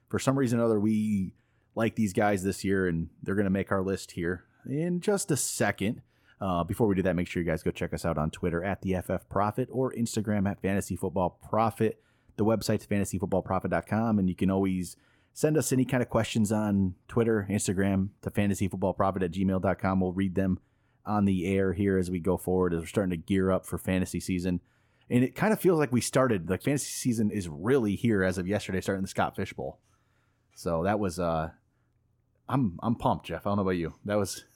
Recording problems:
none

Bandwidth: 17.5 kHz